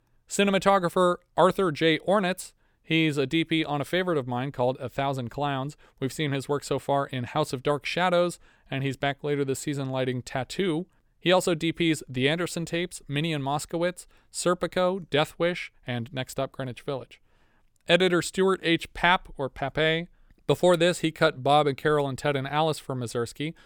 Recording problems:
none

